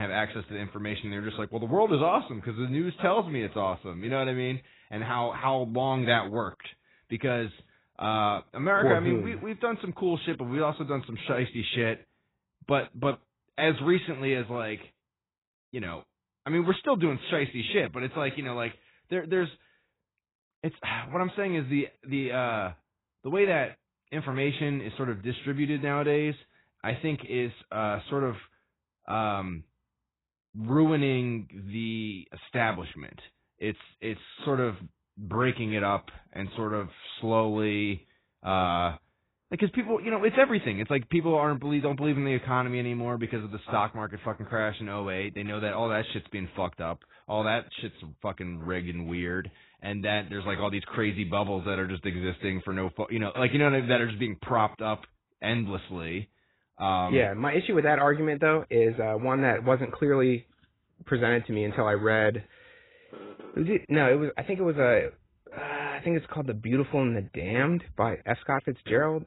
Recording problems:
garbled, watery; badly; nothing above 4 kHz
abrupt cut into speech; at the start

